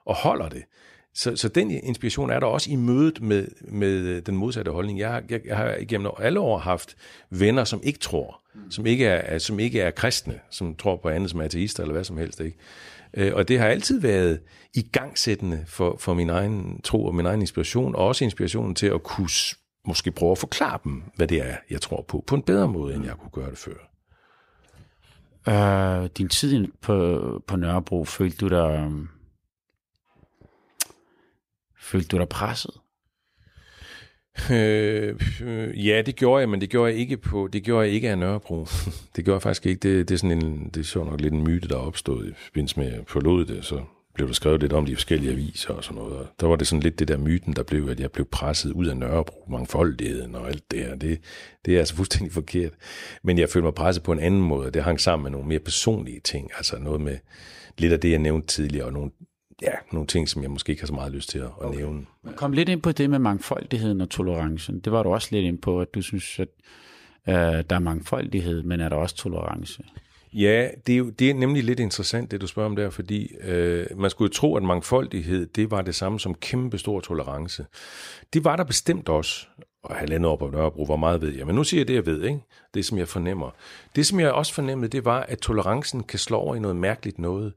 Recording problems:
none

